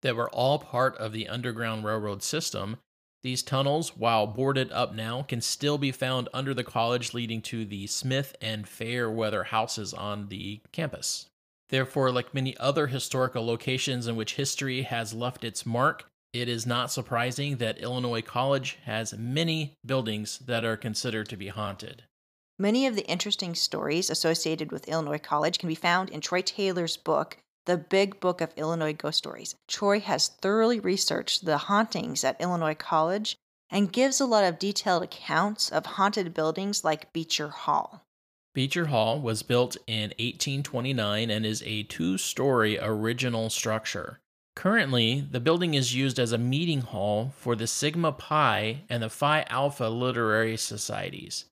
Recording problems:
uneven, jittery; strongly; from 8.5 to 51 s

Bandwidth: 15 kHz